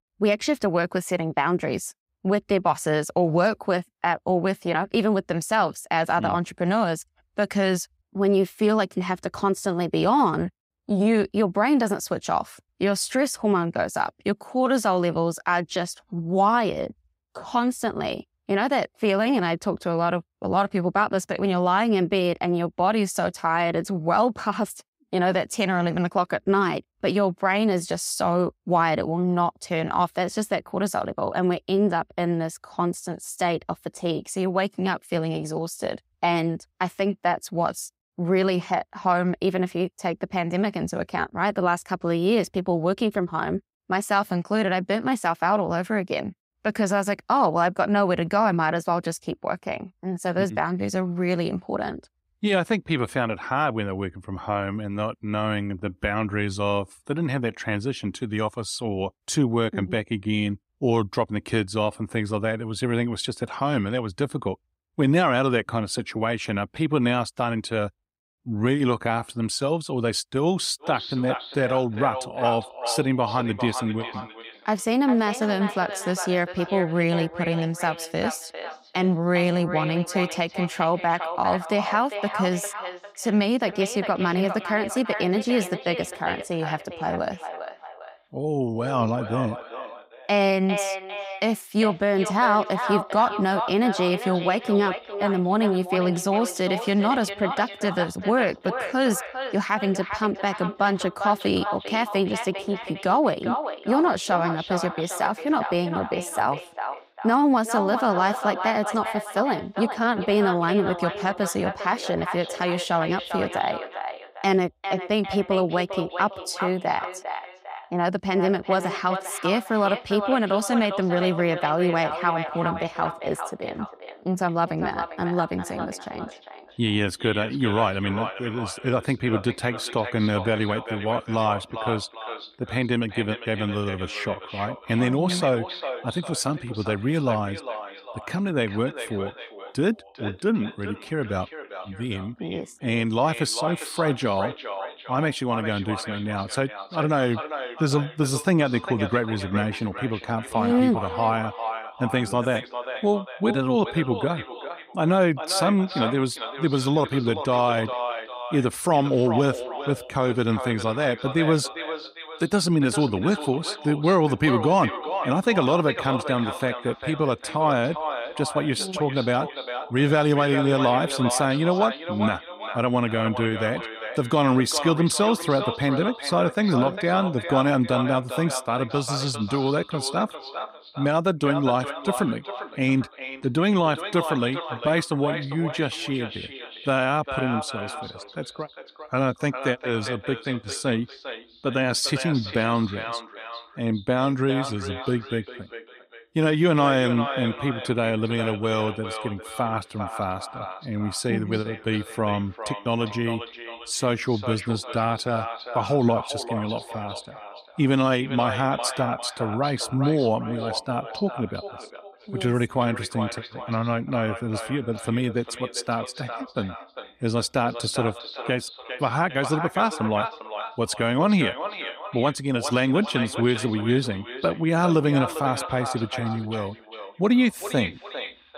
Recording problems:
echo of what is said; strong; from 1:11 on; 400 ms later, 9 dB below the speech

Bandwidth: 15.5 kHz